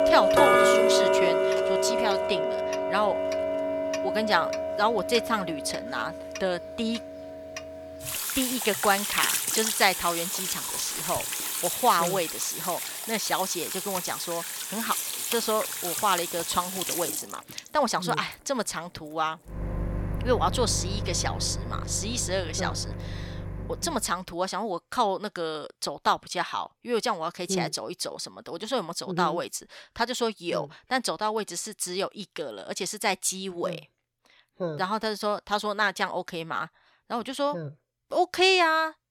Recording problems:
household noises; very loud; until 24 s; as loud as the speech

